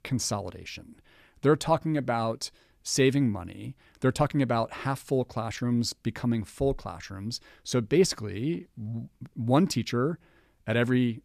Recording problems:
none

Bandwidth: 14.5 kHz